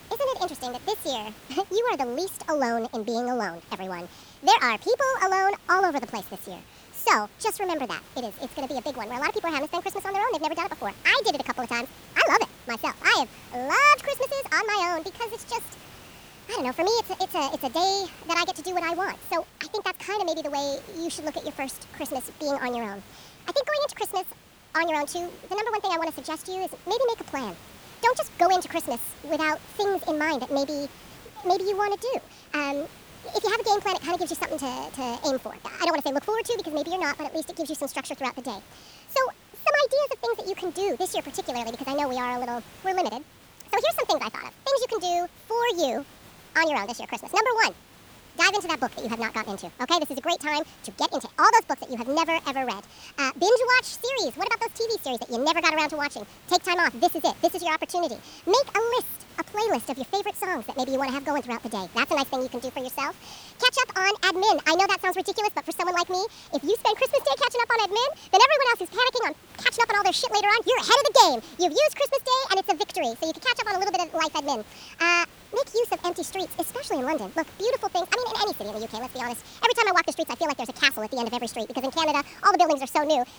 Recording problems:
wrong speed and pitch; too fast and too high; 1.5 times normal speed
hiss; faint; throughout; 25 dB below the speech

